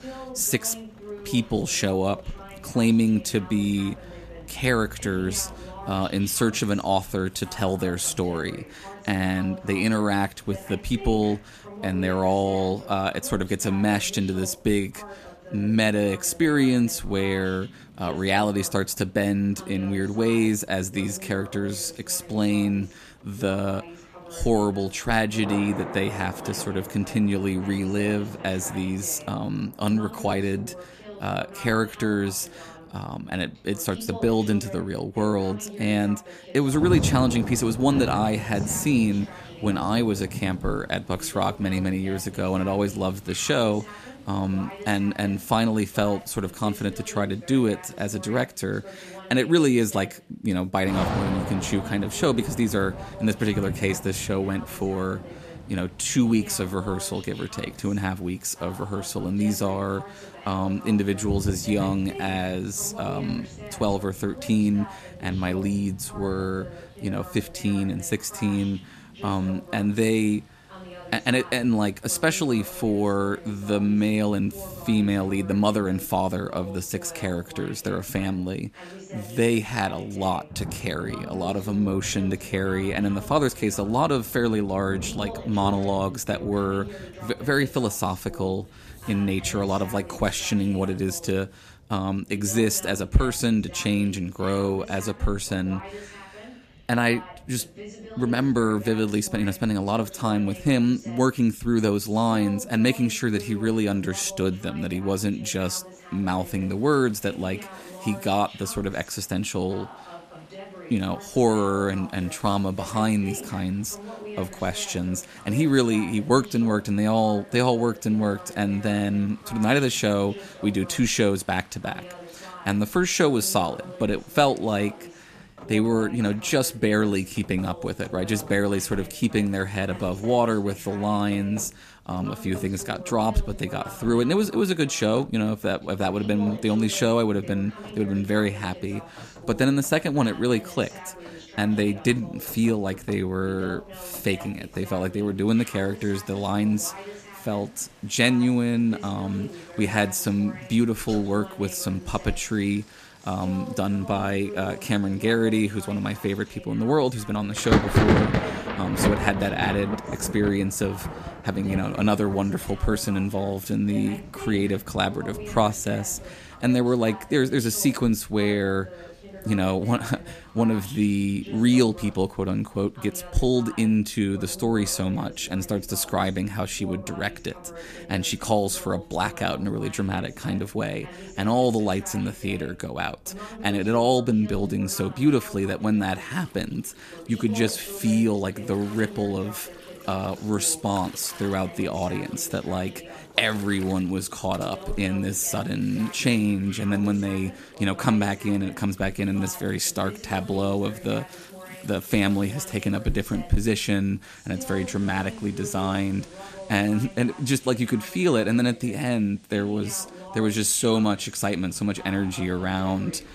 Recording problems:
rain or running water; noticeable; throughout; 10 dB below the speech
voice in the background; noticeable; throughout; 15 dB below the speech

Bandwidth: 14.5 kHz